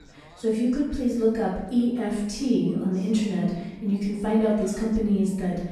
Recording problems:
off-mic speech; far
room echo; noticeable; dies away in 0.8 s
background chatter; faint; throughout; 2 voices, 25 dB below the speech

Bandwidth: 13.5 kHz